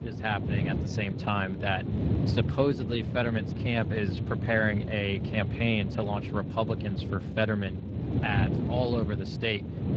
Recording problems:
garbled, watery; slightly
wind noise on the microphone; heavy; 9 dB below the speech

